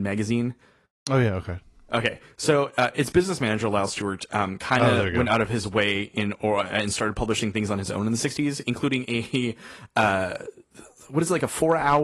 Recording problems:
garbled, watery; slightly; nothing above 11.5 kHz
abrupt cut into speech; at the start and the end

